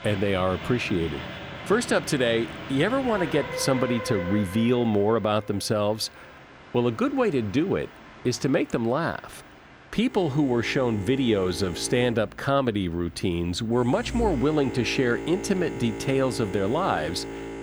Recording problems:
train or aircraft noise; noticeable; throughout; 10 dB below the speech

